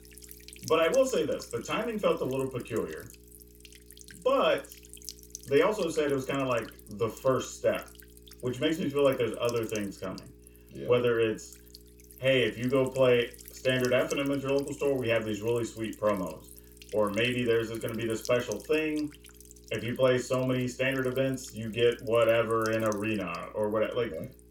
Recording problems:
off-mic speech; far
room echo; very slight; dies away in 0.2 s
electrical hum; faint; throughout; 60 Hz, 20 dB below the speech

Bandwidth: 17 kHz